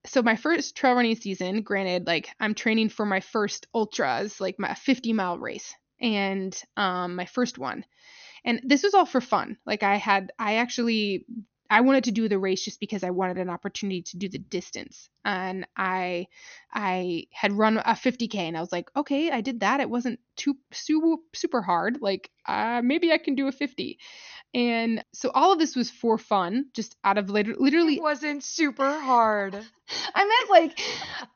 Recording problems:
high frequencies cut off; noticeable; nothing above 6.5 kHz

